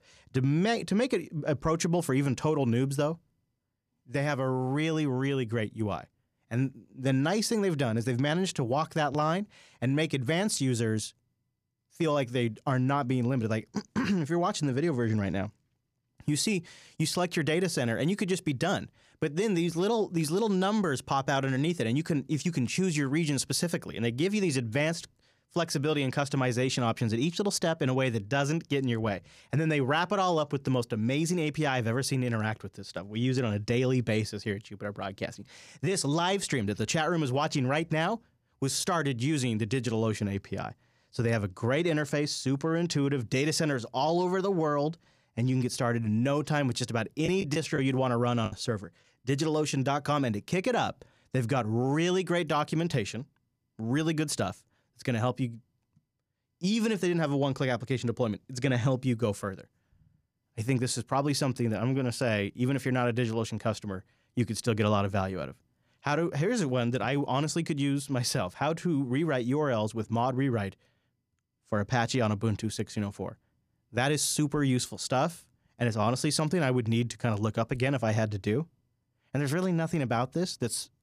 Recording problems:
choppy; very; from 47 to 50 s; 7% of the speech affected

